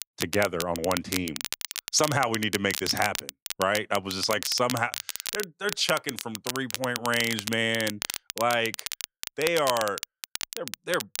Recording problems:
crackle, like an old record; loud; 6 dB below the speech

